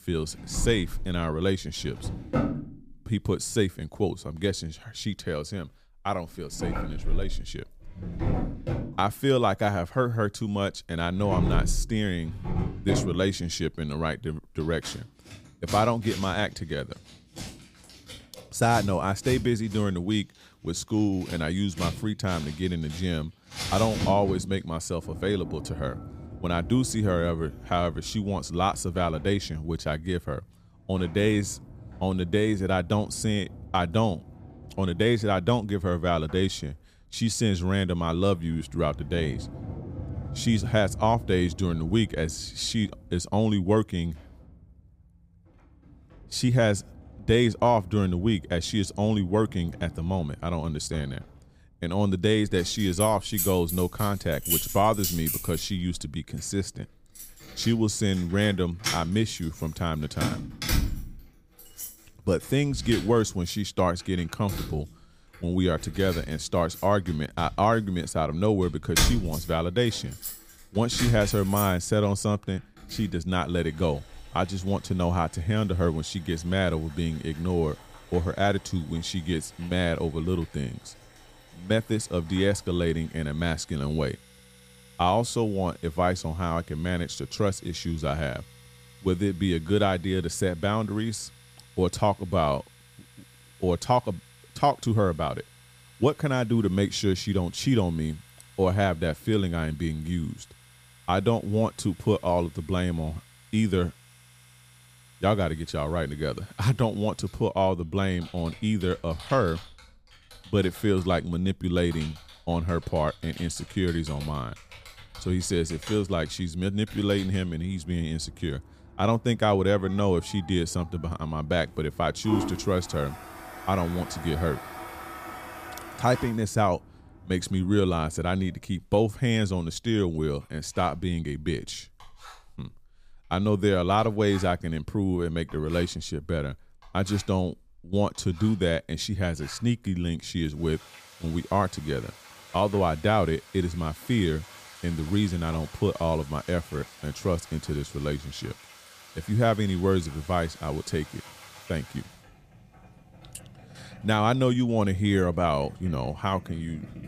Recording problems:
household noises; noticeable; throughout; 10 dB below the speech

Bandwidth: 15 kHz